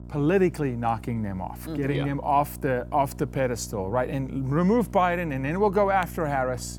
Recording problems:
electrical hum; faint; throughout; 60 Hz, 25 dB below the speech

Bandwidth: 18 kHz